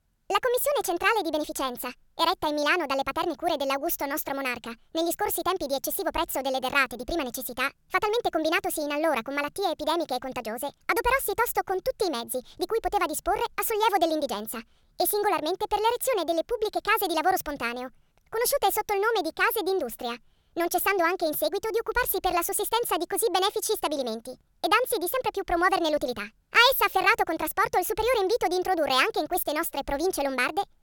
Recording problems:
wrong speed and pitch; too fast and too high; 1.5 times normal speed

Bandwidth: 17 kHz